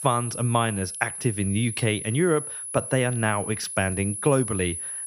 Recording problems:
high-pitched whine; loud; throughout; 10.5 kHz, 6 dB below the speech

